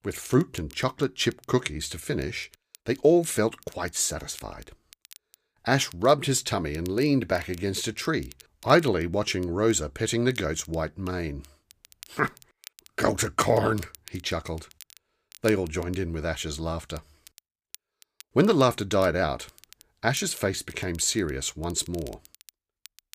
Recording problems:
crackle, like an old record; faint; 25 dB below the speech

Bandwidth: 15 kHz